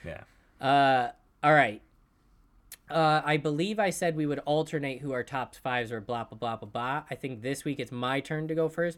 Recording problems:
none

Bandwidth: 18 kHz